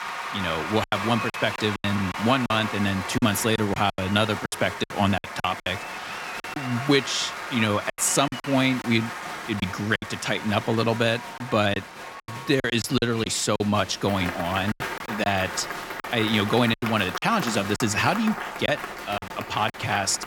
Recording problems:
crowd noise; loud; throughout; 8 dB below the speech
choppy; very; 10% of the speech affected

